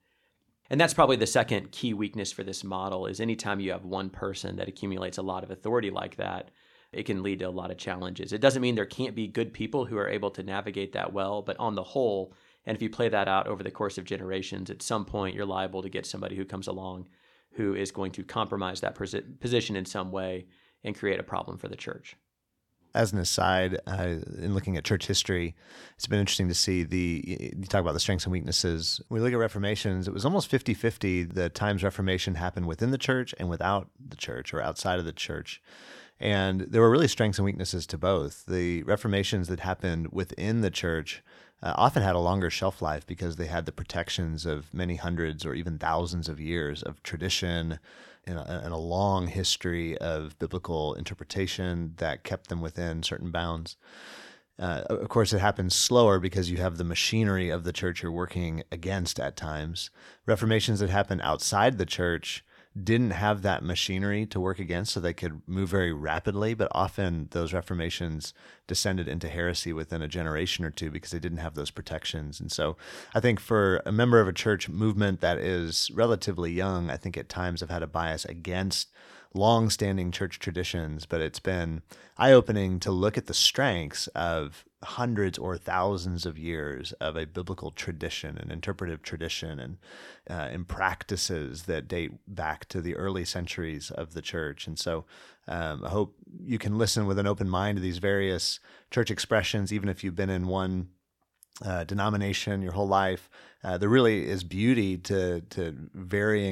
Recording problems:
abrupt cut into speech; at the end

